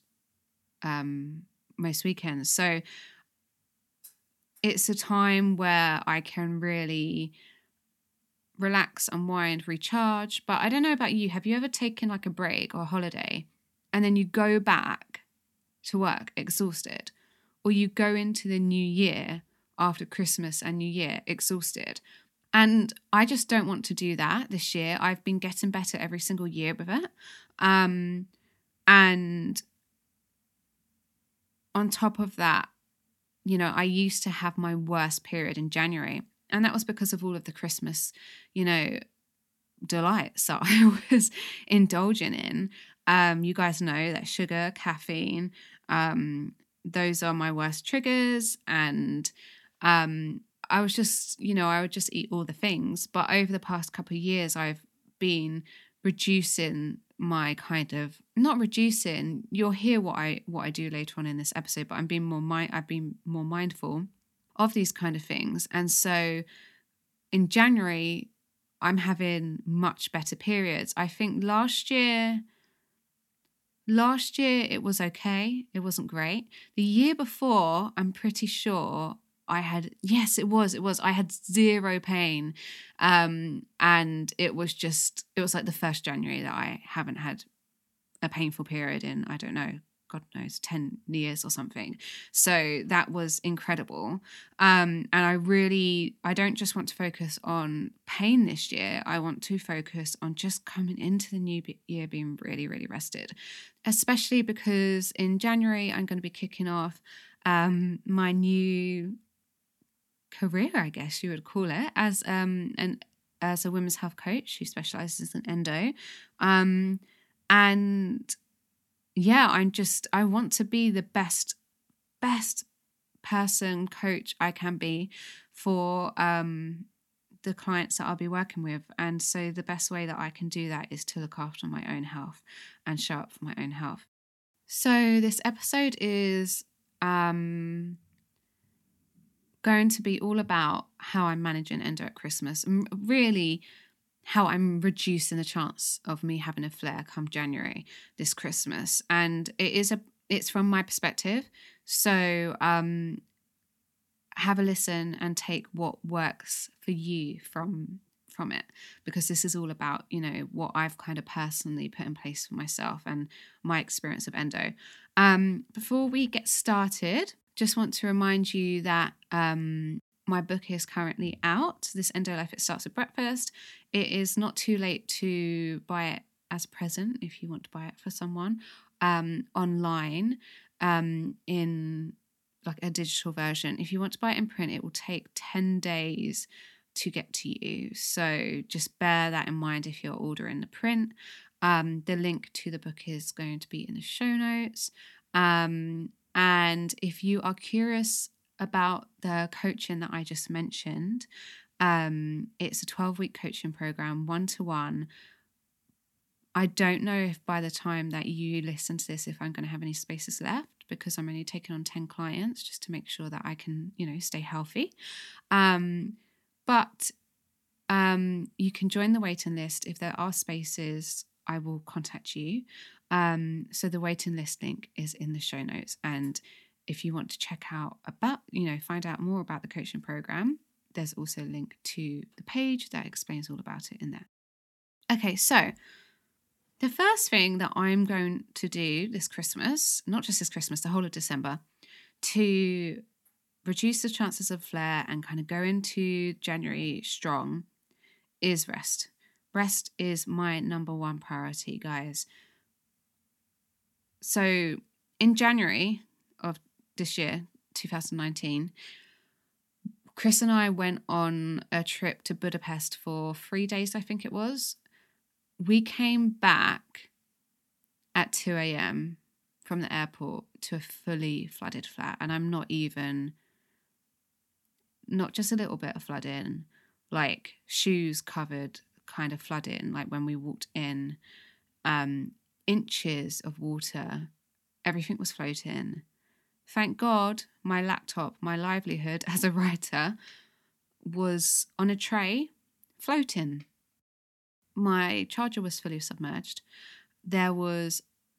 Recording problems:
none

